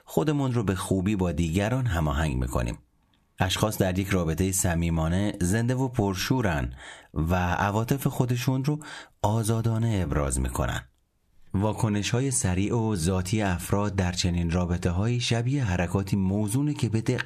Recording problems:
squashed, flat; somewhat

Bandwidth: 14 kHz